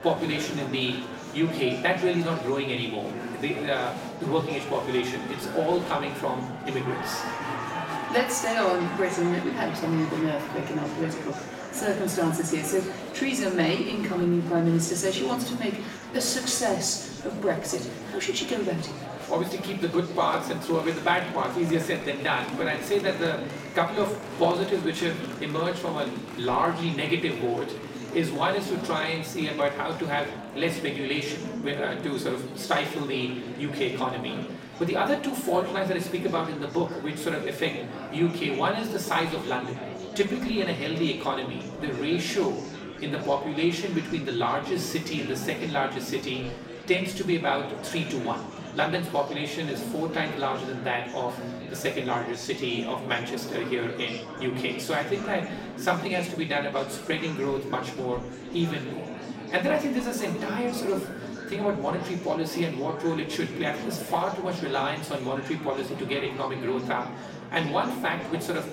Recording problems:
off-mic speech; far
room echo; slight; dies away in 0.8 s
murmuring crowd; loud; throughout; 9 dB below the speech

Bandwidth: 16 kHz